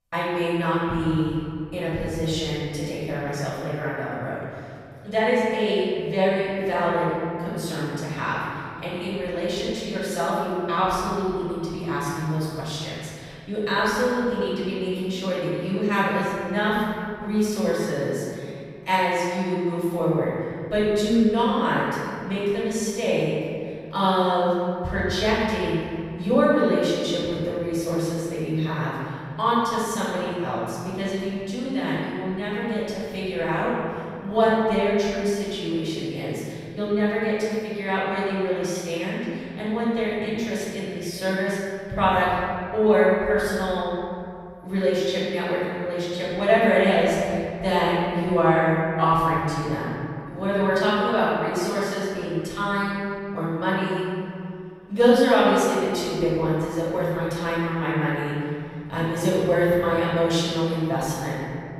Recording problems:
room echo; strong; dies away in 2.3 s
off-mic speech; far

